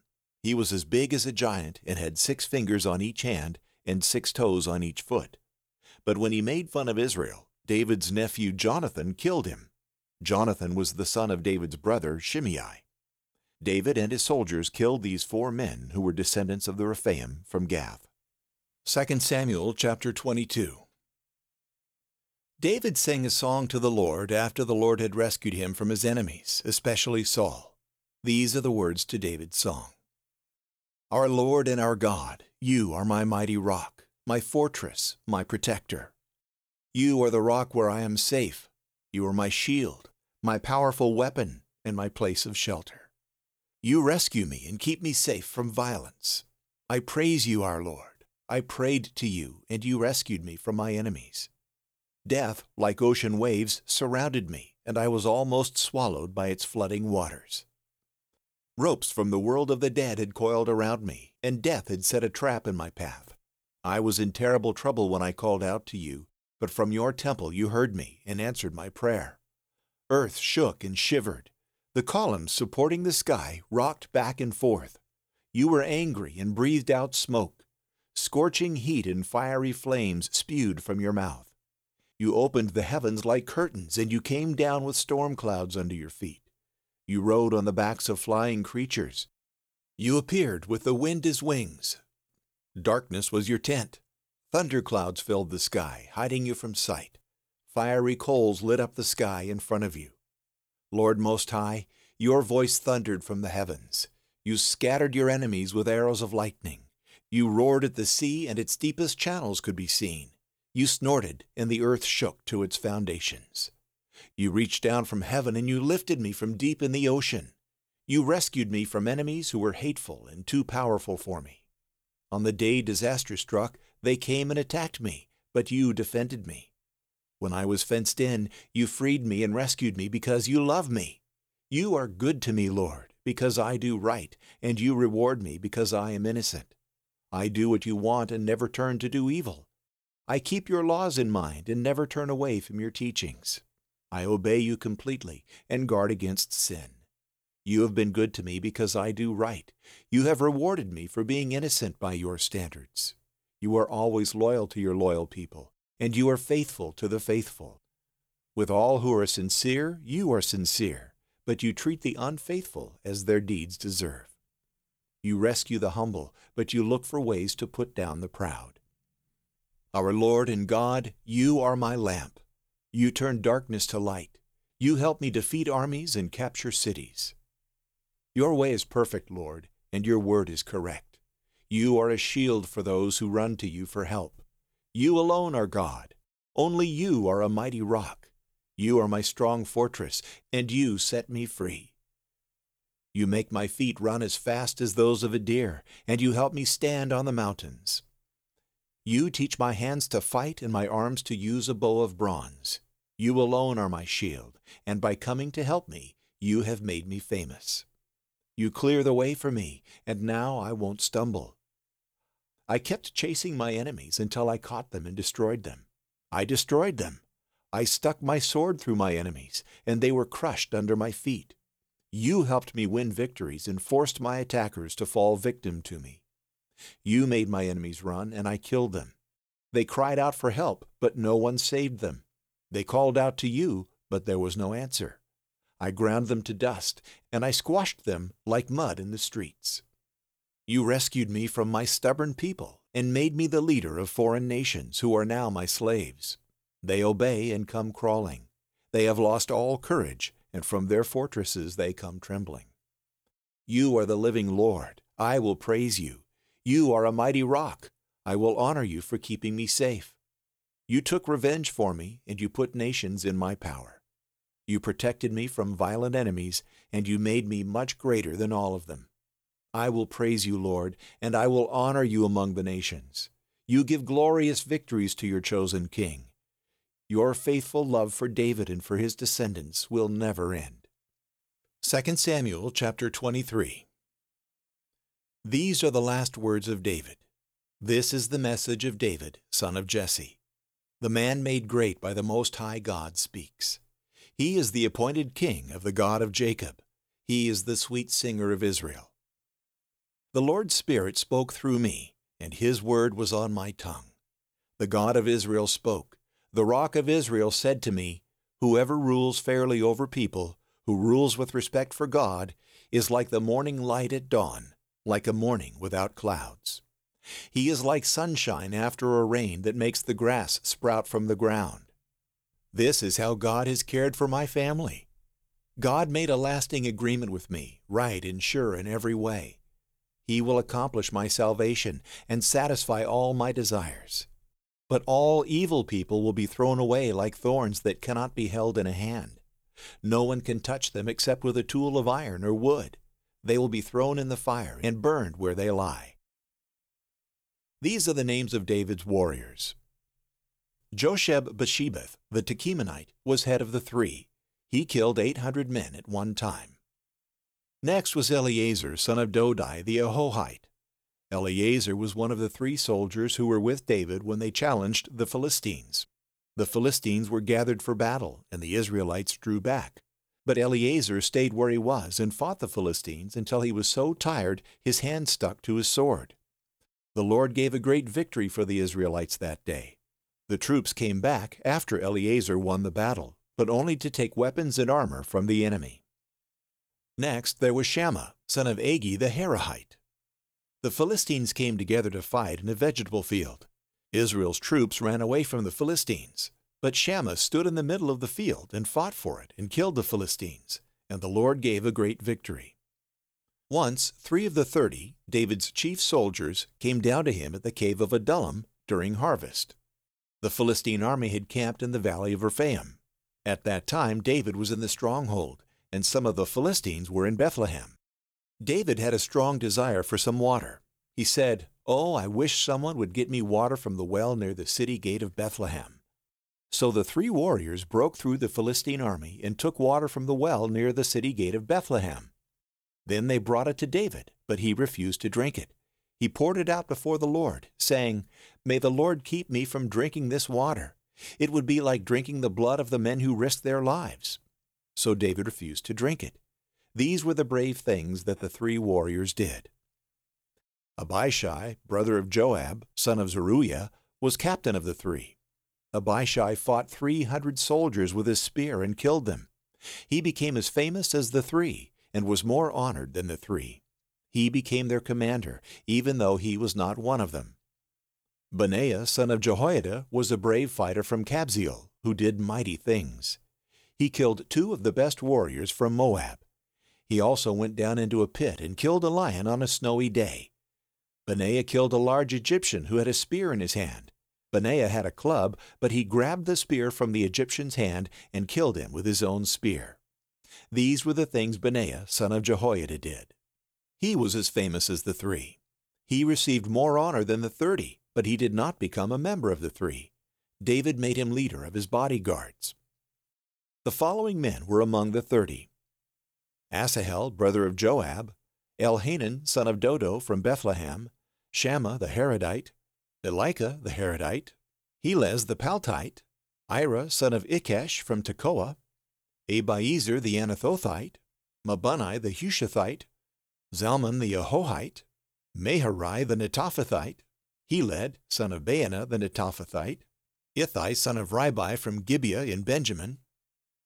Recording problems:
none

